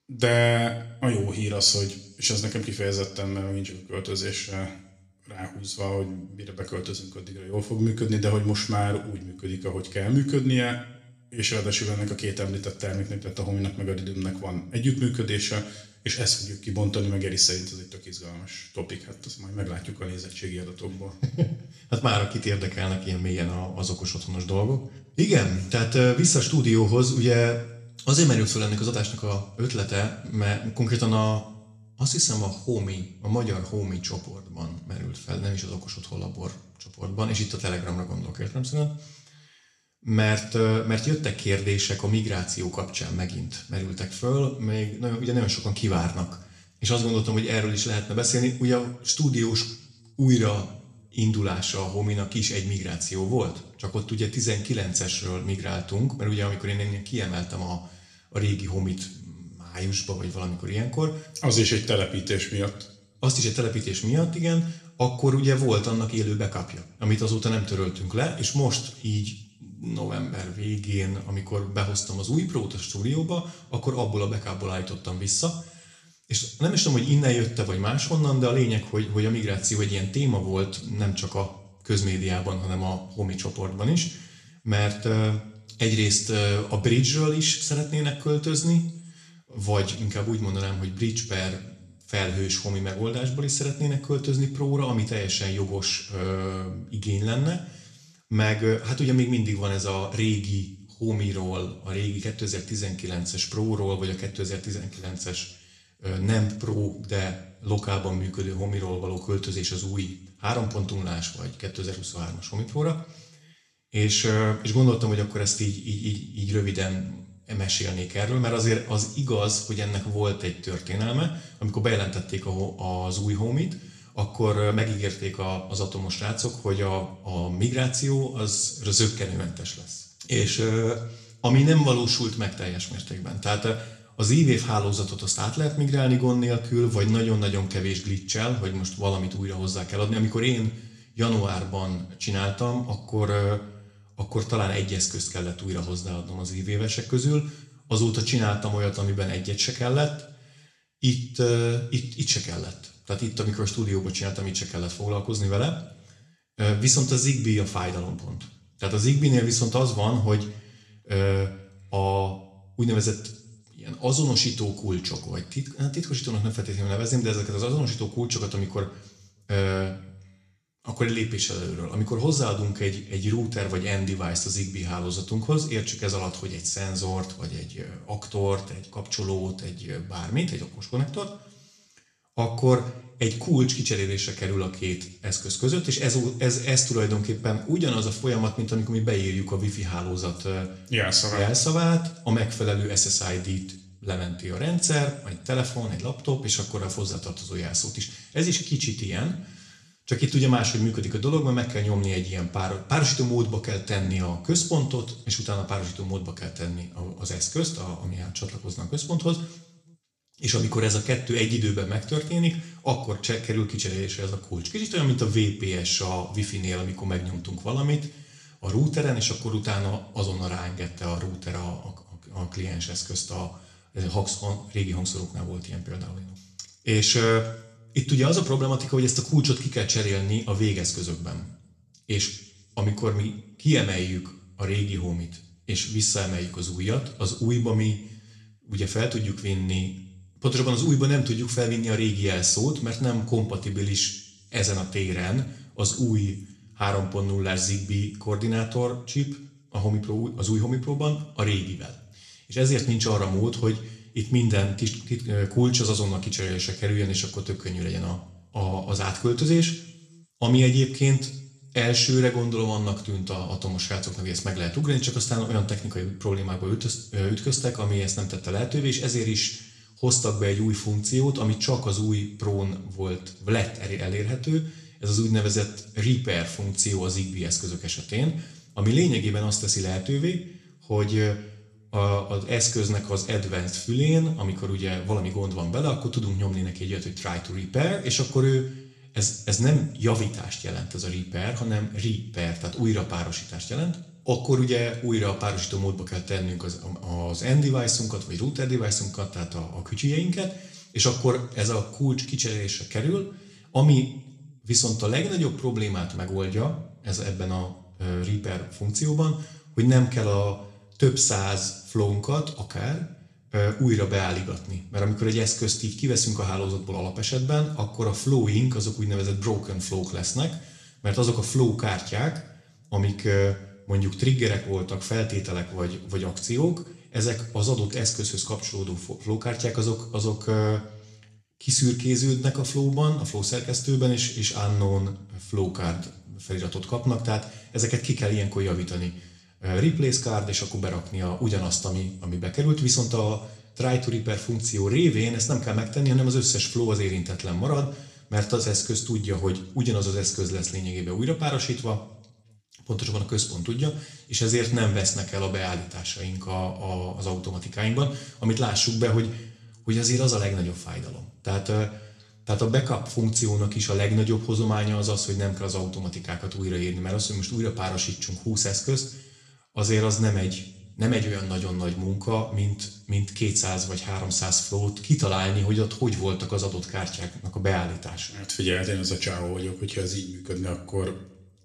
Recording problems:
room echo; slight; dies away in 0.6 s
off-mic speech; somewhat distant

